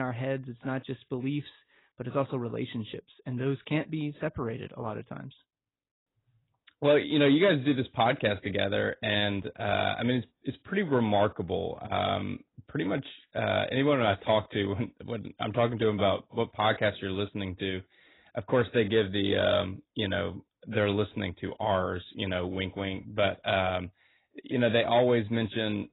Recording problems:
garbled, watery; badly; nothing above 4 kHz
abrupt cut into speech; at the start

